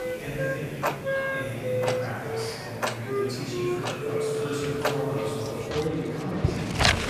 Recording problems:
room echo; strong; dies away in 2.4 s
off-mic speech; far
household noises; very loud; throughout; 2 dB above the speech
background music; very loud; throughout; 1 dB above the speech
murmuring crowd; loud; throughout; 6 dB below the speech

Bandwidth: 14.5 kHz